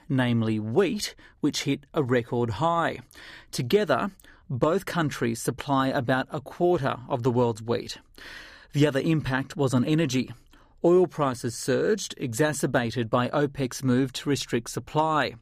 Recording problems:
none

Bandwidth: 15 kHz